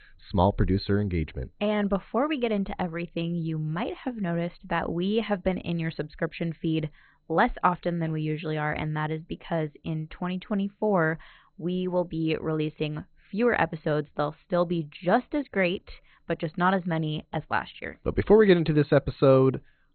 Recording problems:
garbled, watery; badly; nothing above 4 kHz

